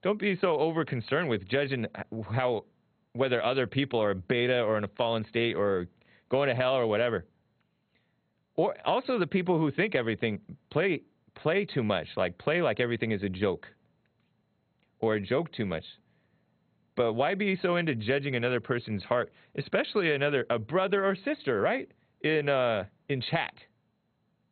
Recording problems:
garbled, watery; badly; nothing above 4 kHz

